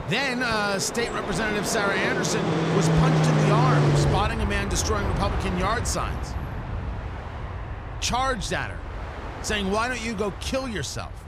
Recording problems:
train or aircraft noise; very loud; throughout; as loud as the speech

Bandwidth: 15 kHz